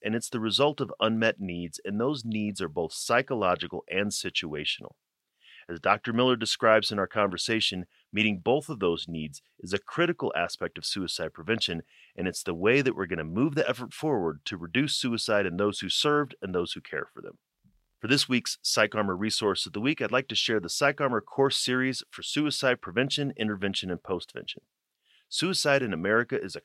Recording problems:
thin; very slightly; fading below 500 Hz

